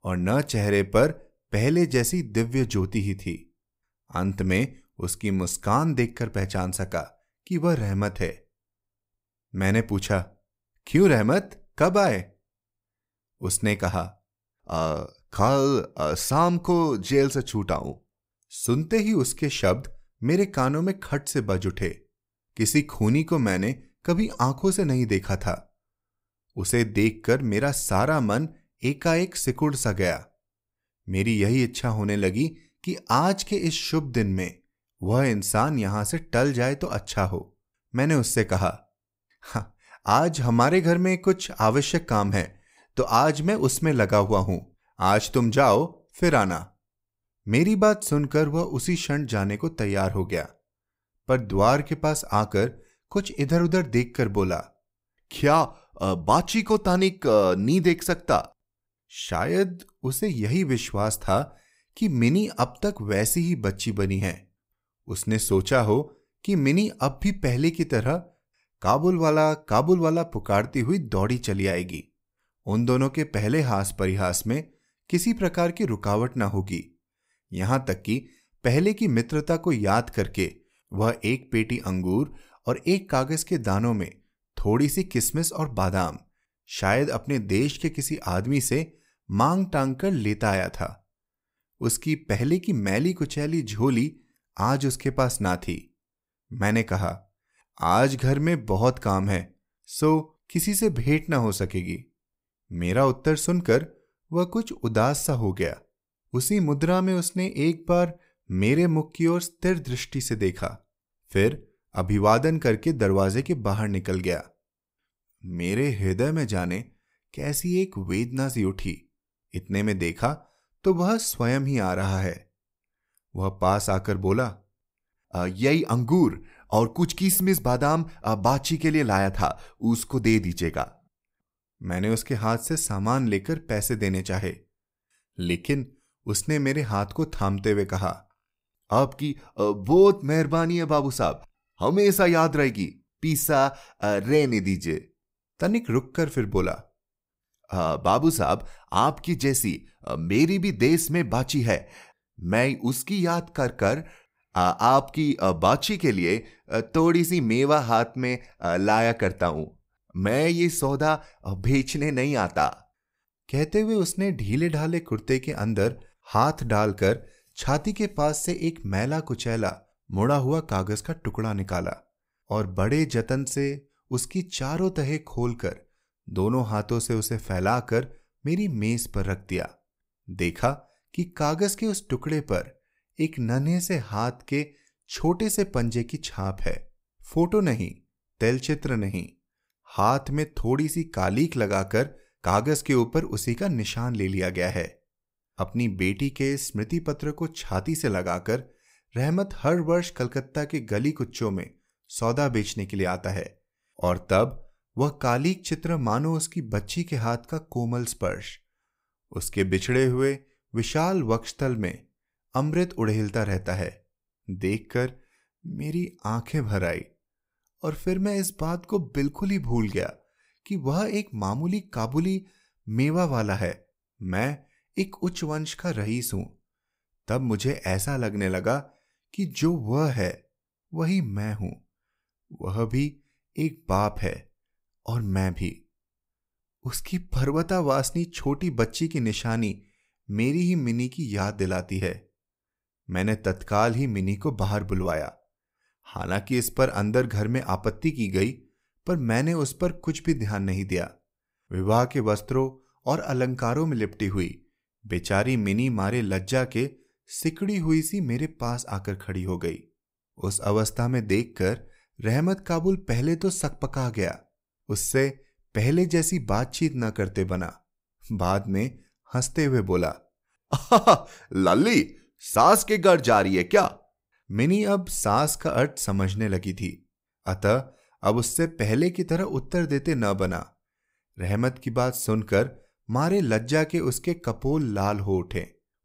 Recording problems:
none

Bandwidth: 15.5 kHz